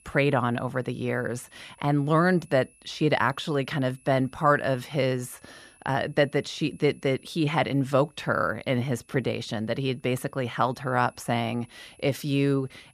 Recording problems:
high-pitched whine; faint; throughout; 10.5 kHz, 30 dB below the speech

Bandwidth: 14.5 kHz